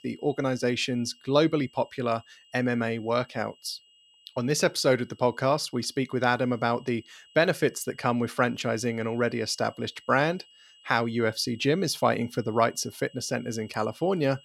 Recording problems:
high-pitched whine; faint; throughout; 3 kHz, 25 dB below the speech

